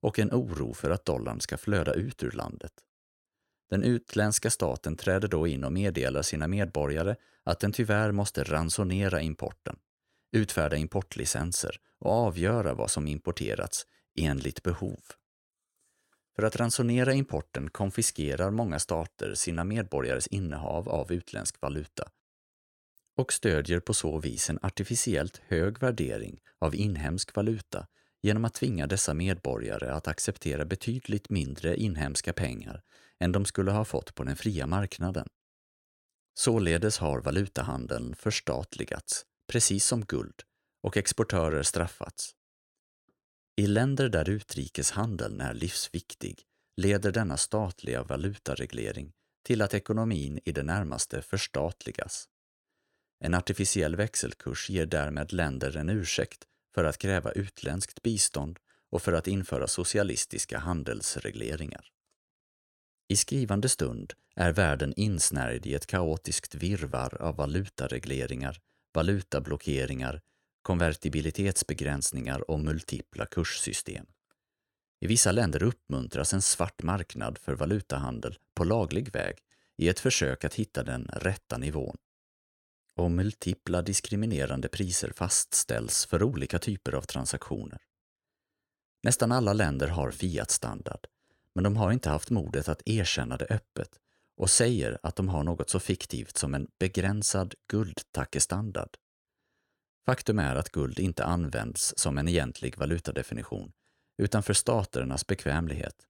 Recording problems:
none

